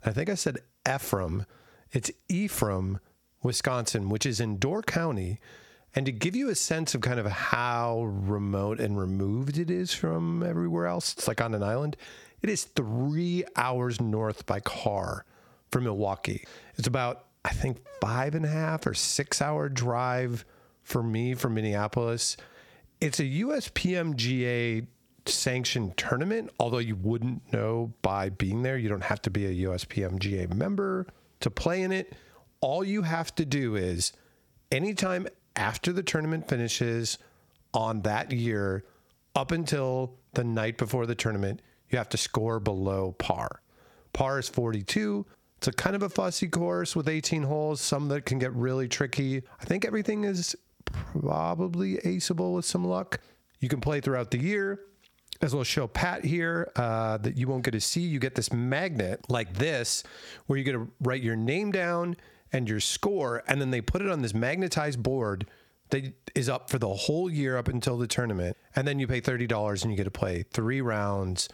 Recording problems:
squashed, flat; heavily

